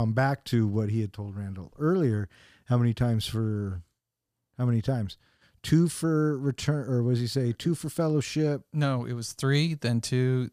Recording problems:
abrupt cut into speech; at the start

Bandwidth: 15 kHz